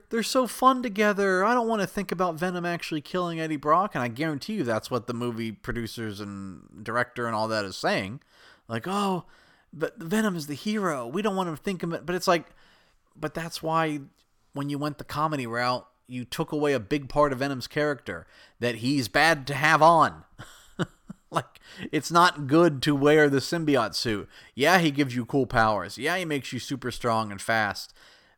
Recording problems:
none

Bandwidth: 18 kHz